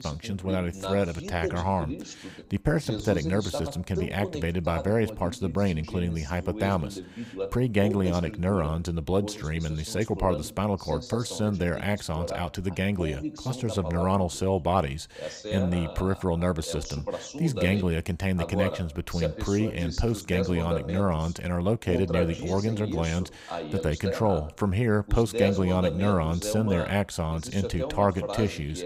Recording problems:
voice in the background; loud; throughout; 8 dB below the speech

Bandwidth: 15.5 kHz